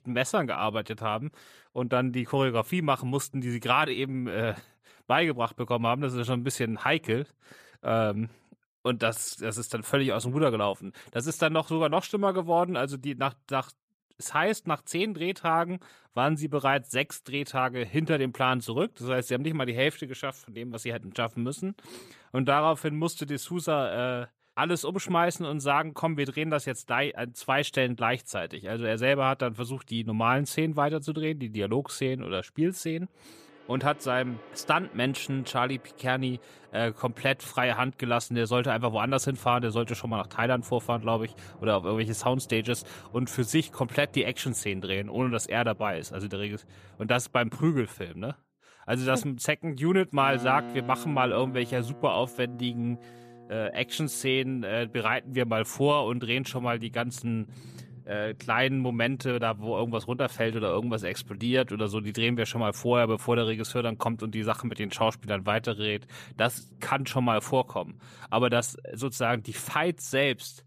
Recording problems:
background music; faint; from 34 s on; 20 dB below the speech

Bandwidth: 14.5 kHz